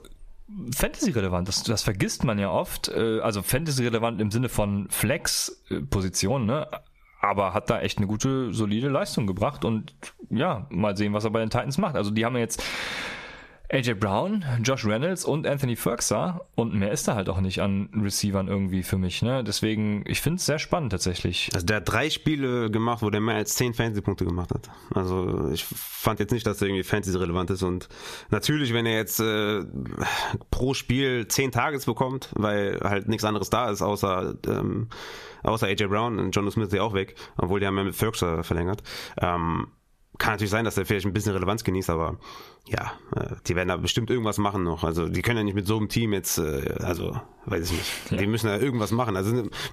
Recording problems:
squashed, flat; heavily

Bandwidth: 14.5 kHz